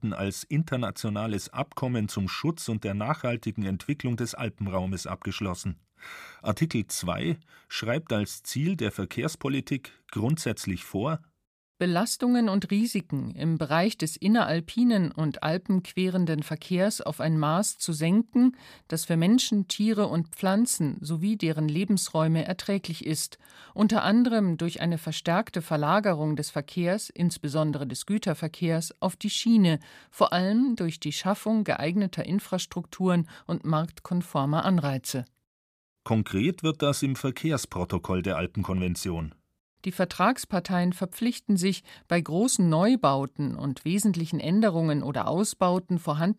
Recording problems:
none

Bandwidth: 15 kHz